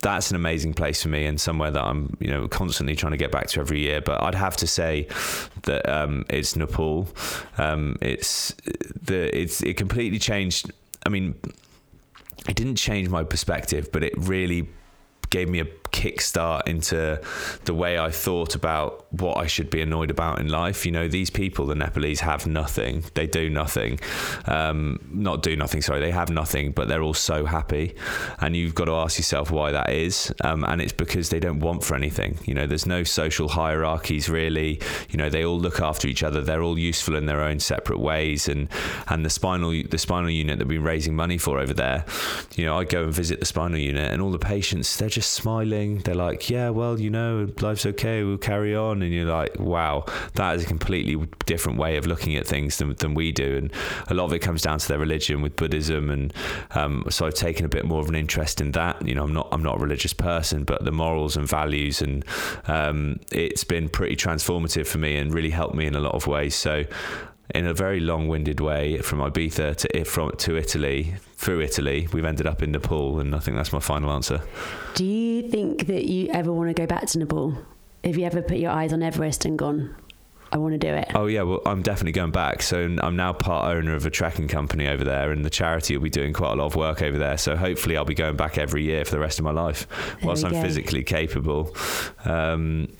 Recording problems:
squashed, flat; heavily

